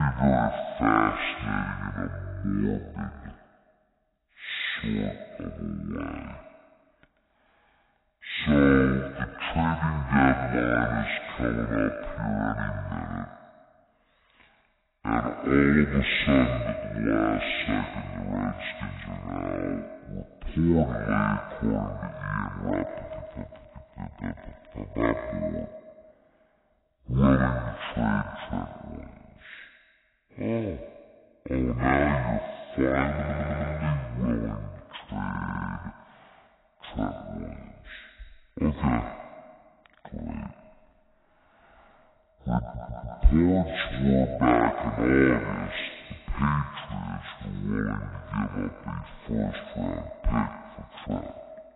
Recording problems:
echo of what is said; strong; throughout; 130 ms later, 10 dB below the speech
garbled, watery; badly; nothing above 4 kHz
wrong speed and pitch; too slow and too low; 0.5 times normal speed
abrupt cut into speech; at the start
audio stuttering; at 33 s, at 35 s and at 43 s

